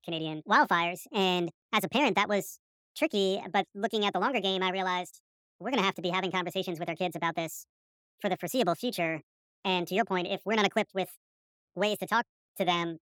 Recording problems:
wrong speed and pitch; too fast and too high; 1.5 times normal speed

